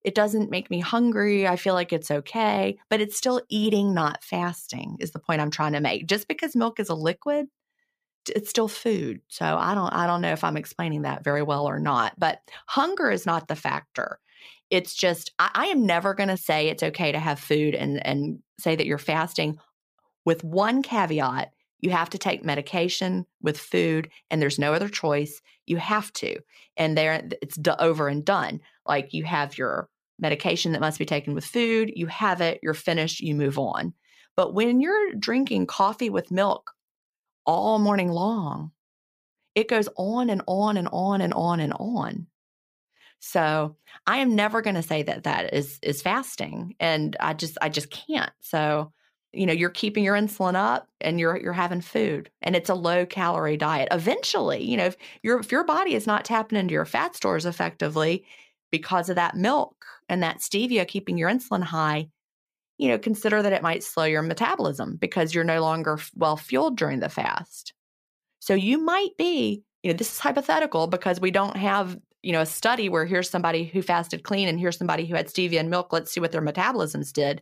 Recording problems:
none

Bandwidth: 15 kHz